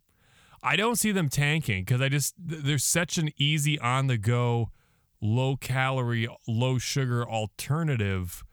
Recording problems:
none

